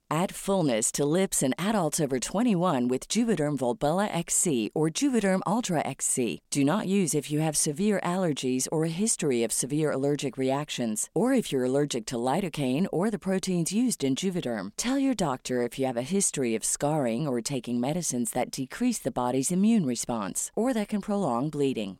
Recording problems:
none

